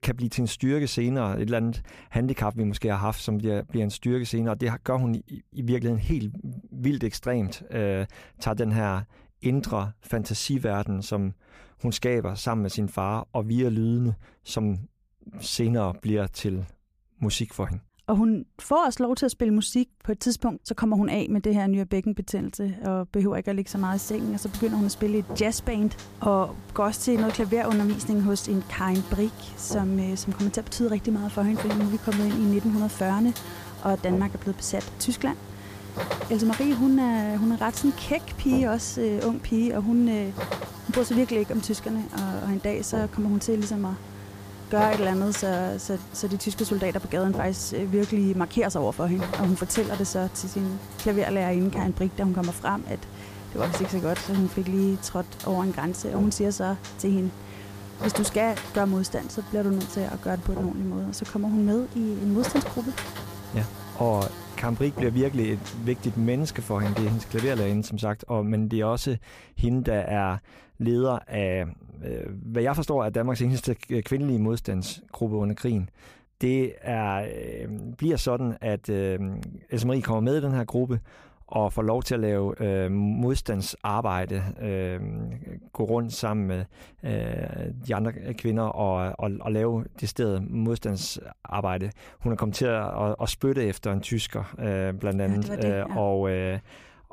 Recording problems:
electrical hum; loud; from 24 s to 1:08; 50 Hz, 9 dB below the speech

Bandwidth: 15 kHz